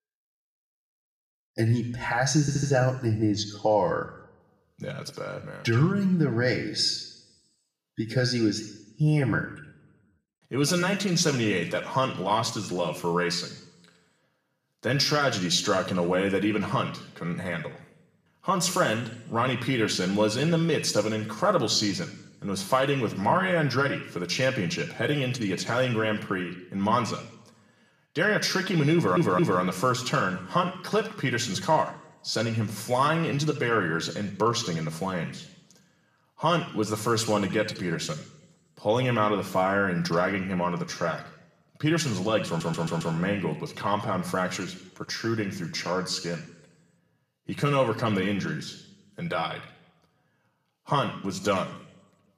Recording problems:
room echo; slight; dies away in 0.8 s
off-mic speech; somewhat distant
audio stuttering; at 2.5 s, at 29 s and at 42 s

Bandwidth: 14.5 kHz